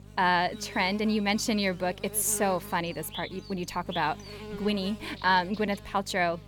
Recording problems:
electrical hum; noticeable; throughout; 50 Hz, 15 dB below the speech

